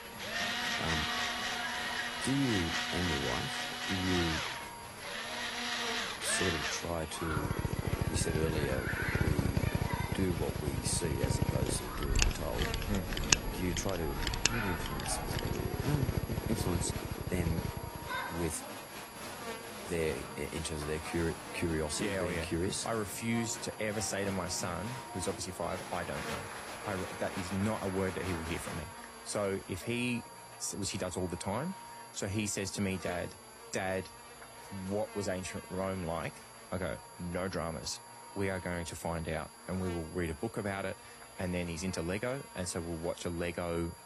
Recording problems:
garbled, watery; slightly; nothing above 15 kHz
machinery noise; very loud; until 18 s; 2 dB above the speech
electrical hum; loud; throughout; 50 Hz, 9 dB below the speech
crowd noise; loud; until 29 s; 7 dB below the speech
high-pitched whine; noticeable; throughout; 11.5 kHz, 15 dB below the speech

